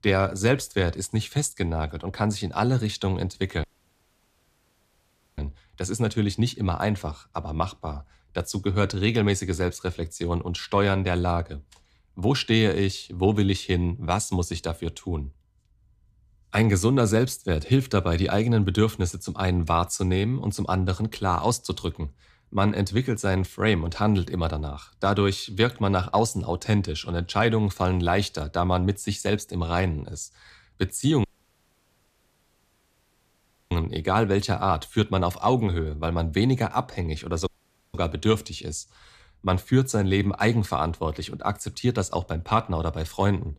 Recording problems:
audio cutting out; at 3.5 s for 1.5 s, at 31 s for 2.5 s and at 37 s

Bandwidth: 14.5 kHz